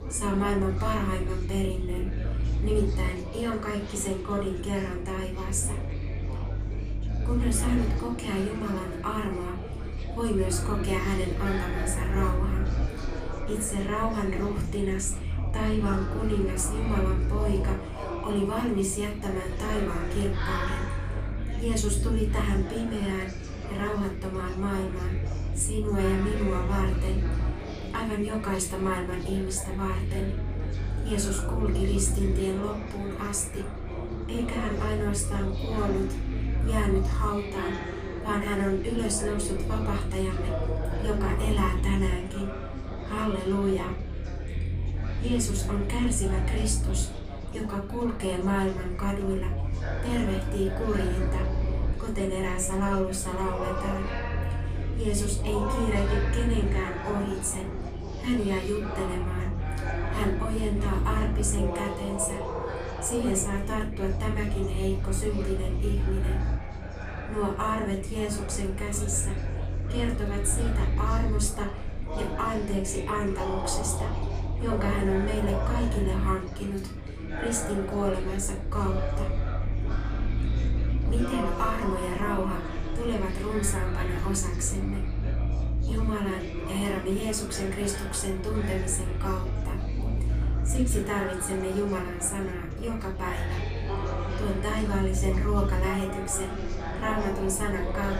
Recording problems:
room echo; slight; dies away in 0.3 s
off-mic speech; somewhat distant
chatter from many people; loud; throughout; 8 dB below the speech
low rumble; noticeable; throughout; 15 dB below the speech

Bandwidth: 15 kHz